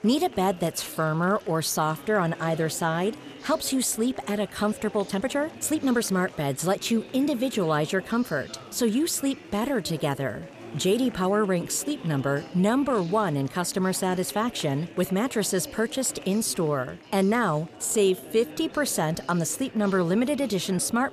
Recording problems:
chatter from many people; noticeable; throughout; 15 dB below the speech
uneven, jittery; strongly; from 0.5 to 19 s

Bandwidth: 14.5 kHz